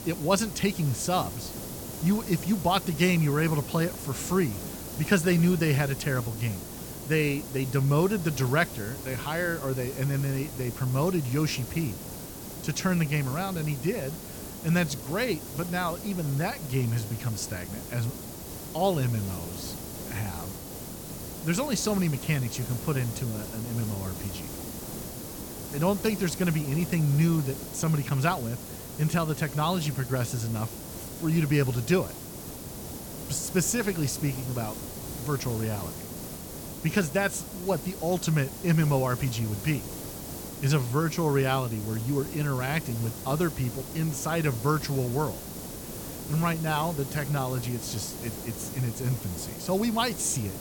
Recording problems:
hiss; loud; throughout; 9 dB below the speech

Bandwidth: 17.5 kHz